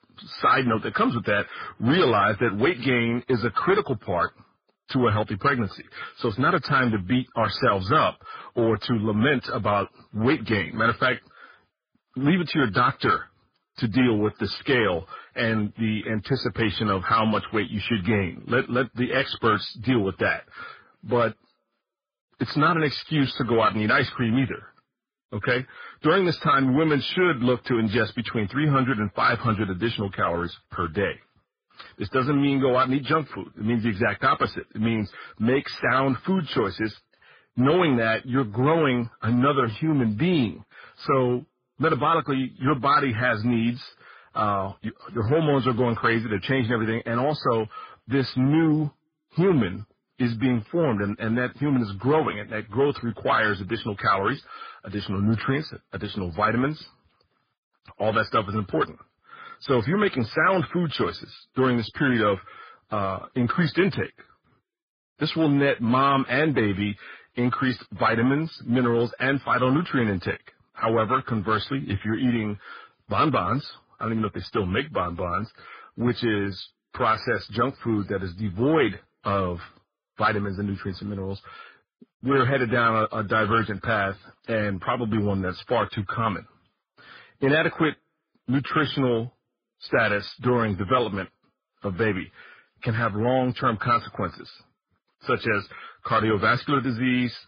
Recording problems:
garbled, watery; badly; nothing above 5 kHz
distortion; slight; 10 dB below the speech

